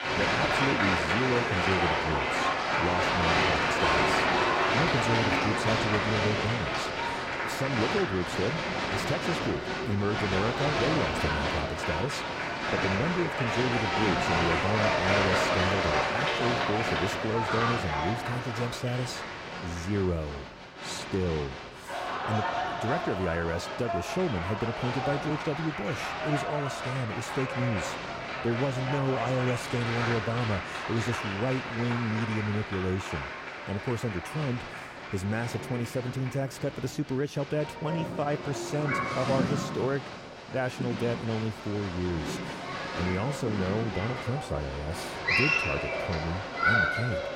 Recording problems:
crowd noise; very loud; throughout; 3 dB above the speech

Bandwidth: 16 kHz